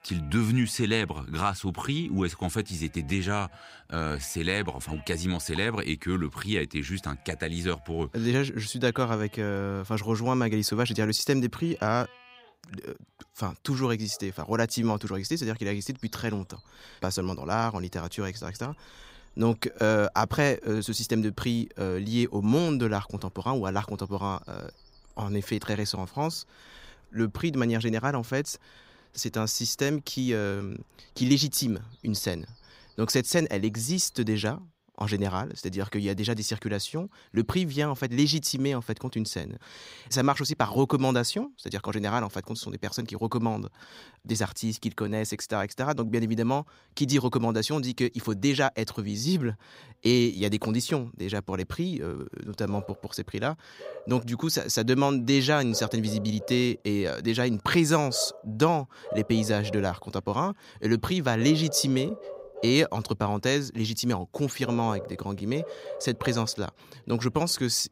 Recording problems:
animal sounds; noticeable; throughout; 15 dB below the speech

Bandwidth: 15.5 kHz